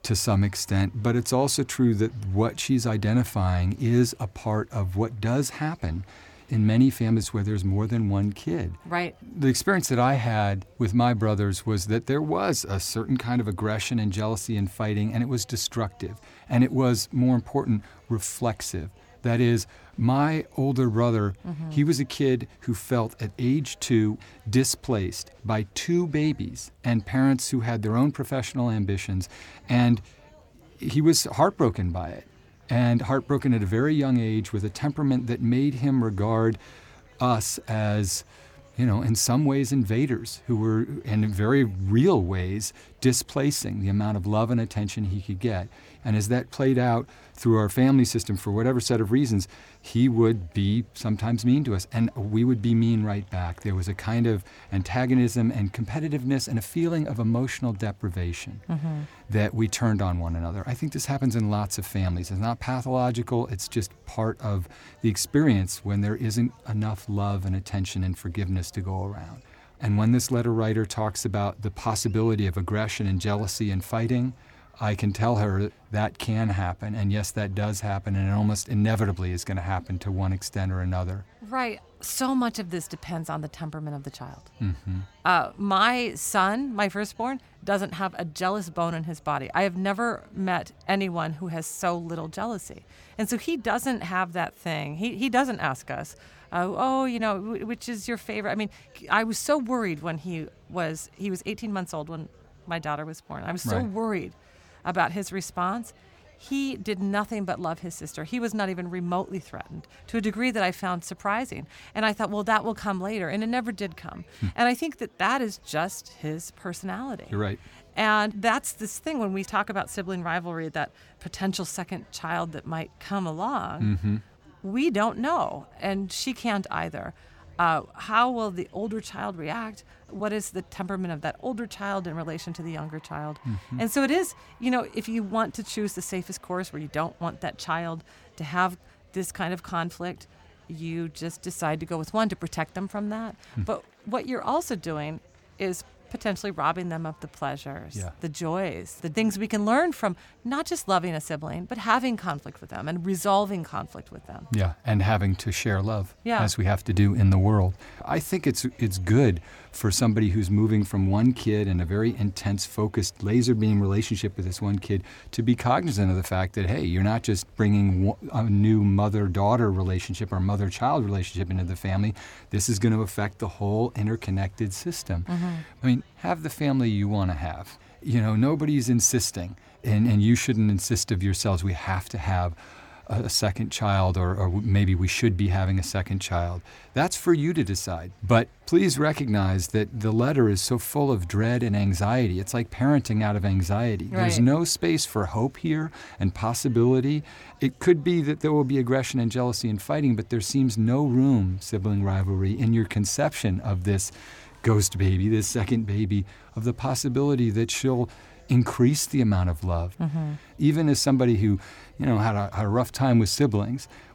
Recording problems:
murmuring crowd; faint; throughout; 30 dB below the speech

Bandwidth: 18.5 kHz